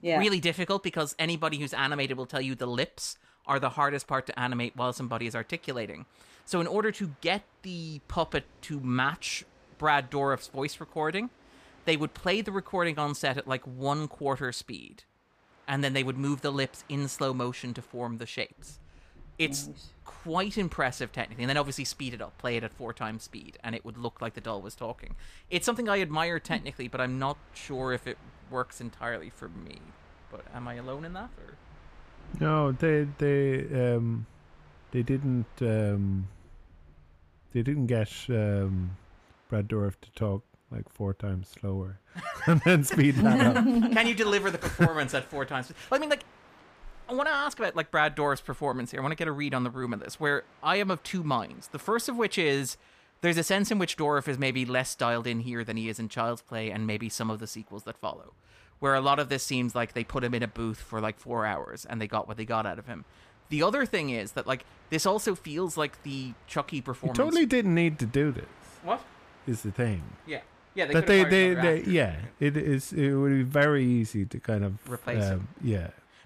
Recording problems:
train or aircraft noise; faint; throughout; 30 dB below the speech

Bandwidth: 15 kHz